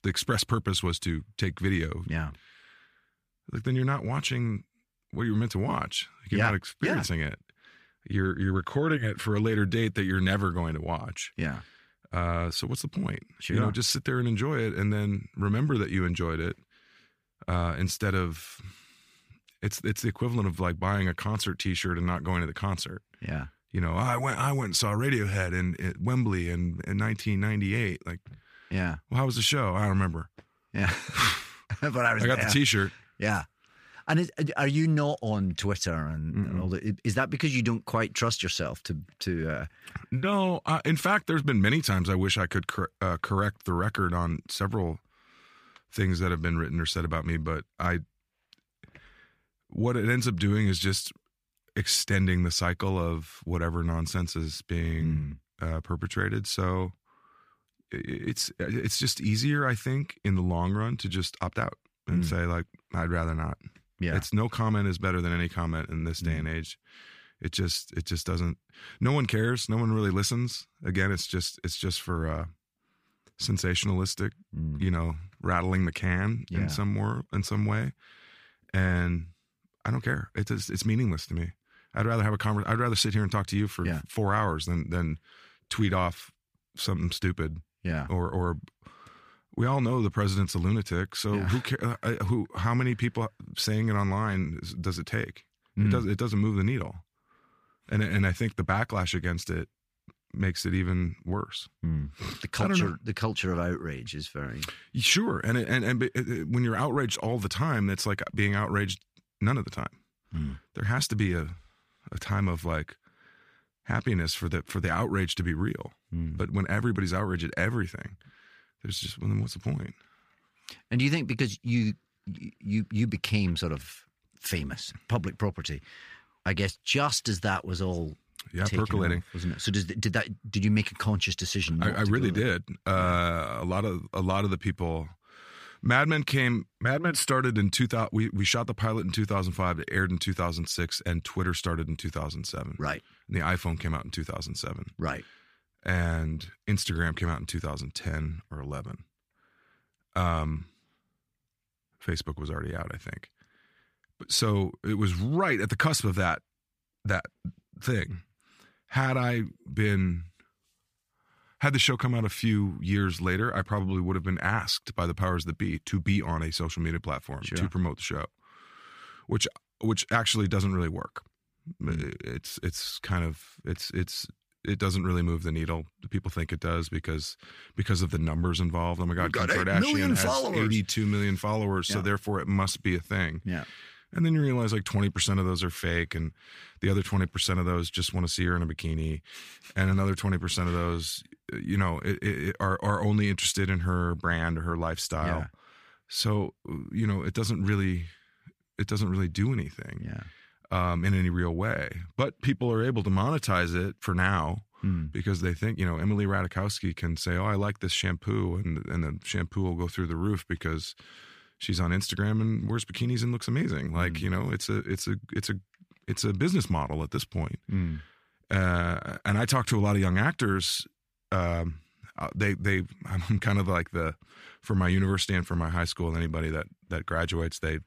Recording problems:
none

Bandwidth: 15 kHz